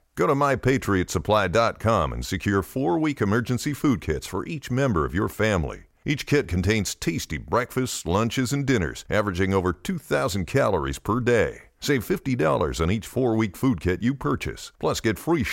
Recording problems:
abrupt cut into speech; at the end

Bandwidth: 16 kHz